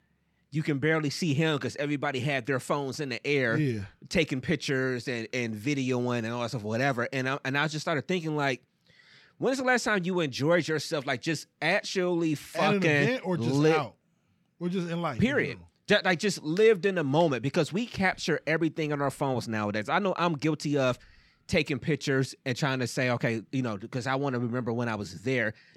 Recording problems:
none

